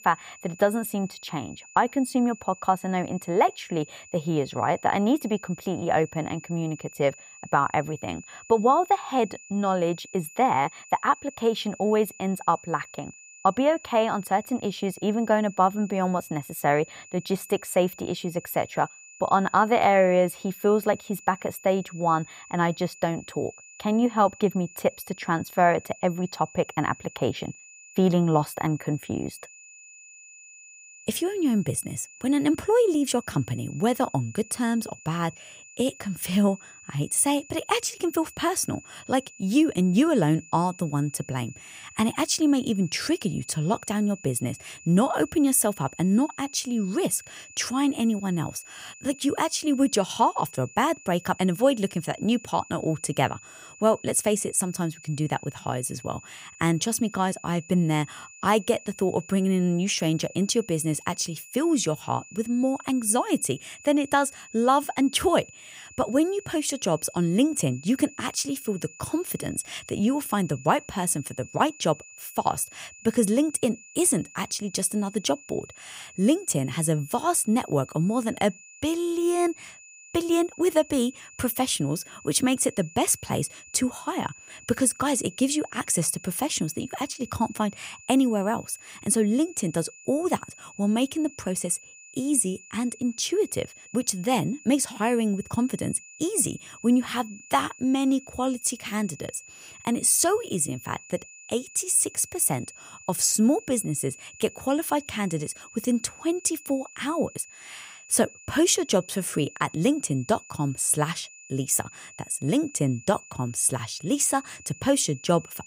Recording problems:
high-pitched whine; noticeable; throughout; 2.5 kHz, 20 dB below the speech

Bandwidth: 15.5 kHz